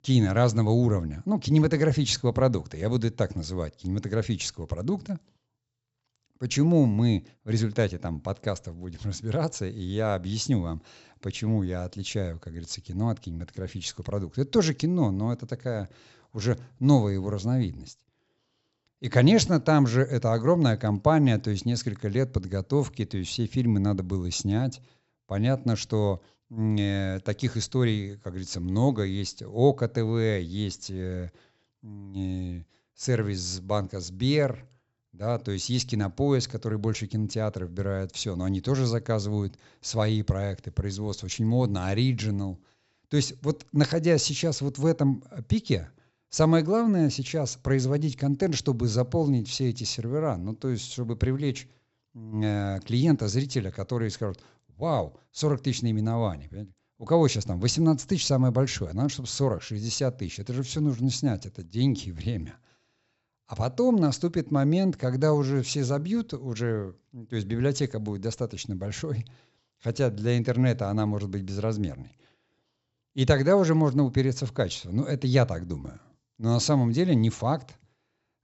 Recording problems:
high frequencies cut off; noticeable; nothing above 7.5 kHz

